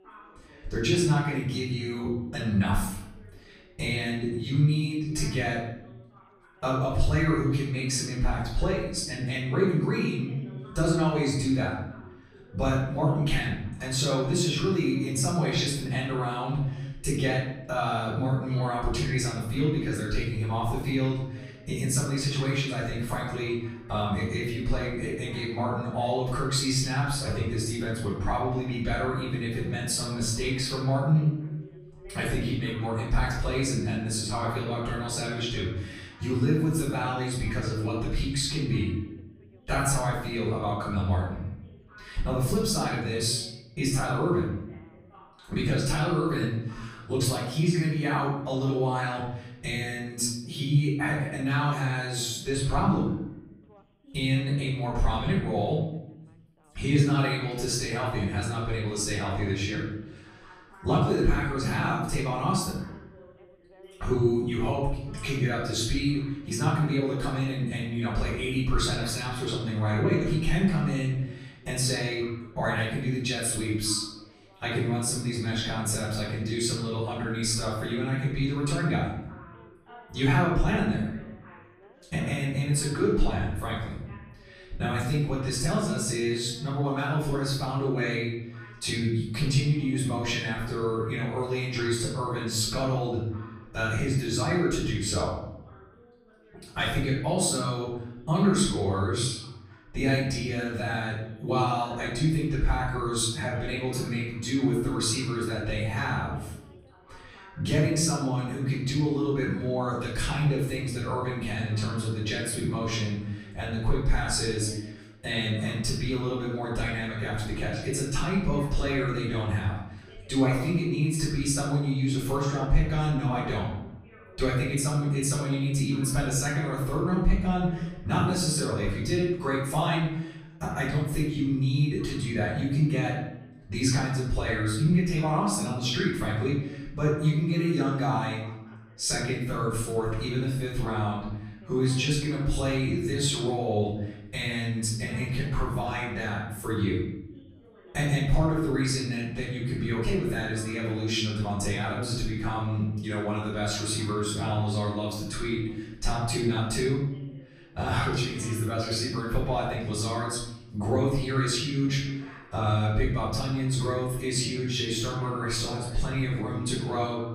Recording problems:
off-mic speech; far
room echo; noticeable; dies away in 0.8 s
background chatter; faint; throughout; 3 voices, 25 dB below the speech

